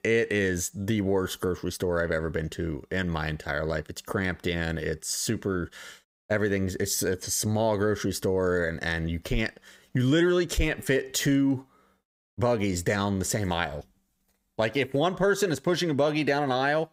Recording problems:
none

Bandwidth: 15.5 kHz